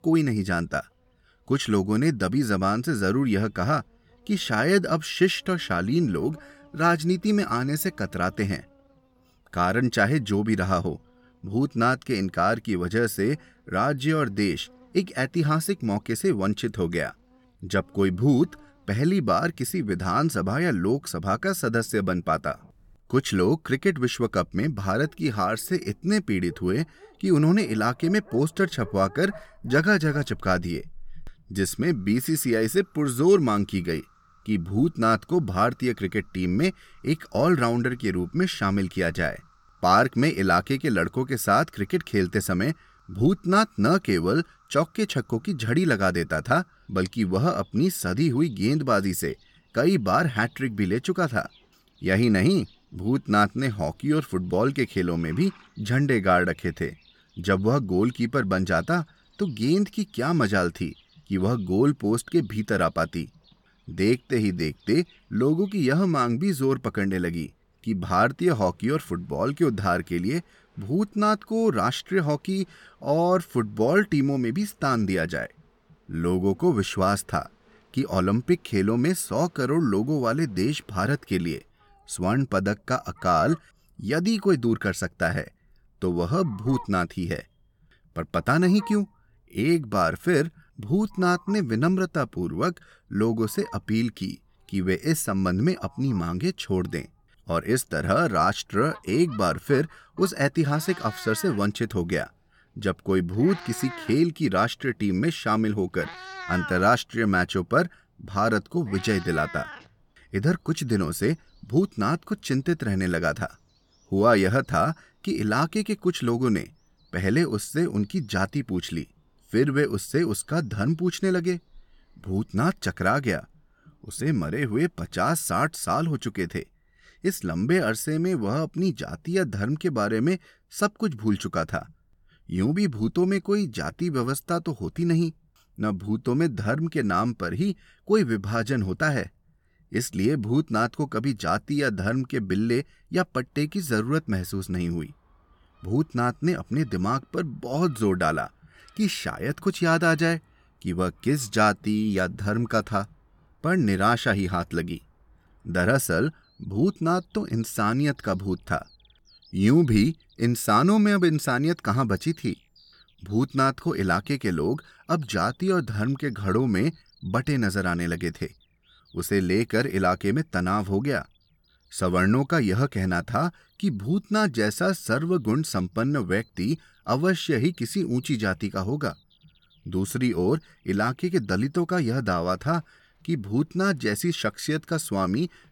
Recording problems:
animal sounds; faint; throughout; 25 dB below the speech

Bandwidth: 17 kHz